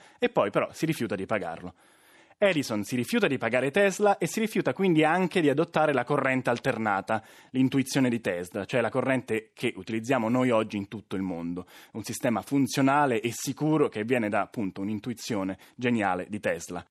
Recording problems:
none

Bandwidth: 13.5 kHz